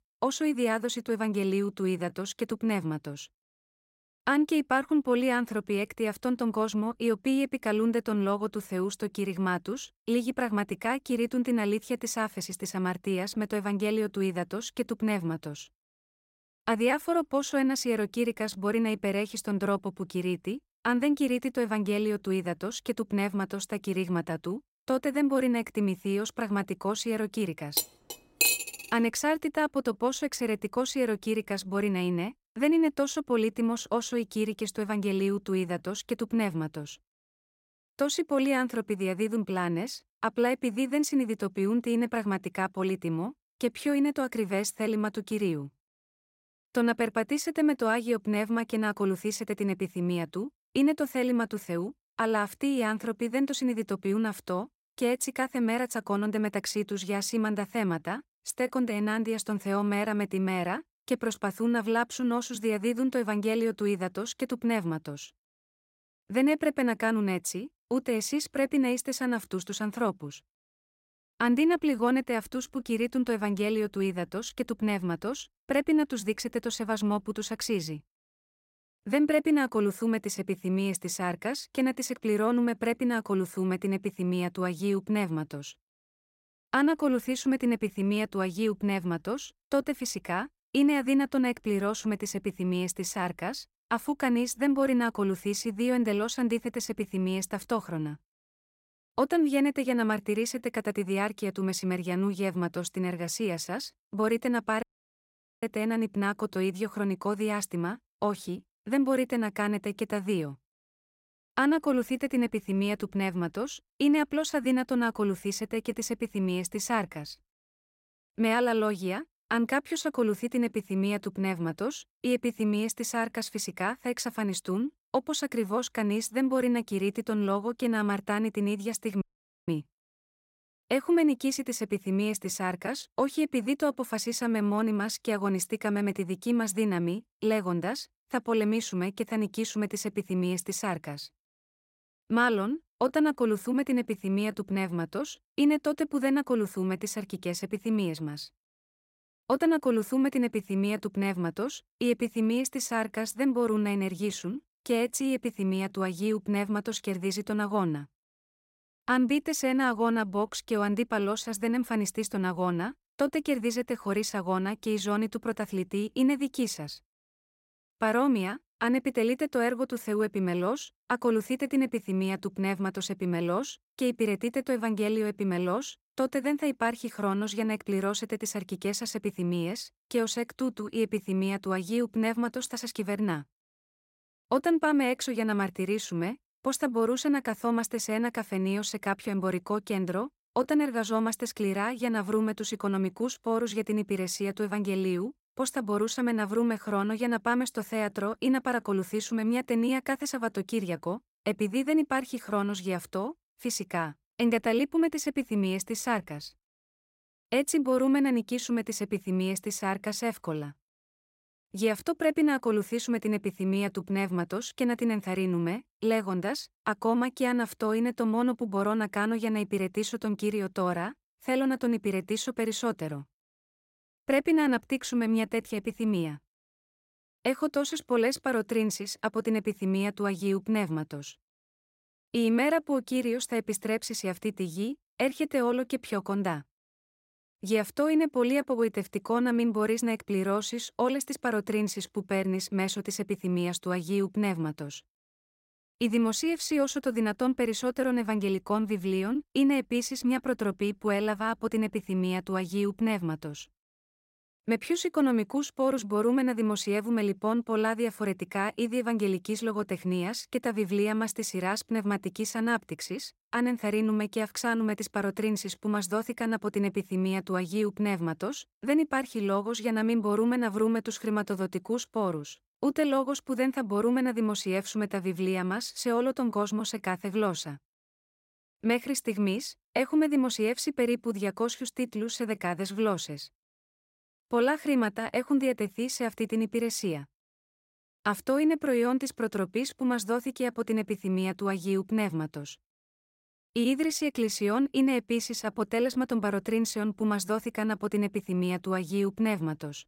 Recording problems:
clattering dishes; loud; at 28 s; peak 6 dB above the speech
audio cutting out; at 1:45 for 1 s and at 2:09

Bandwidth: 16 kHz